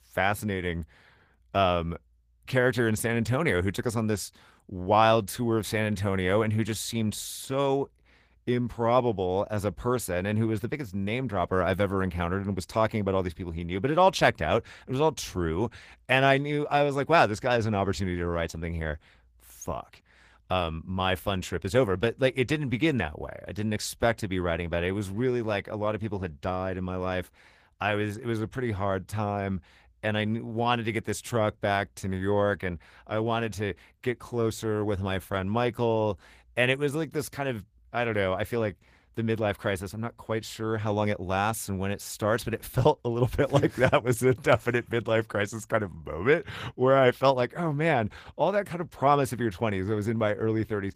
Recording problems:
garbled, watery; slightly; nothing above 15 kHz

